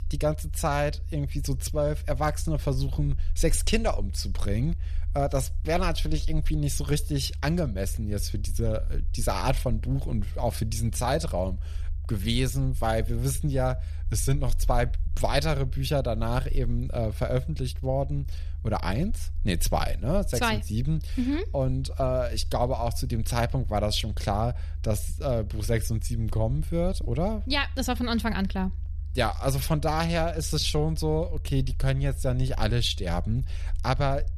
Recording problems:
low rumble; faint; throughout; 25 dB below the speech

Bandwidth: 14 kHz